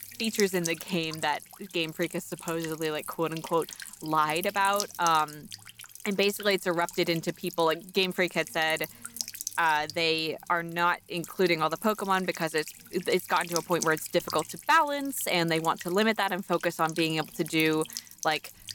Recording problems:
electrical hum; noticeable; throughout; 60 Hz, 15 dB below the speech

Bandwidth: 17 kHz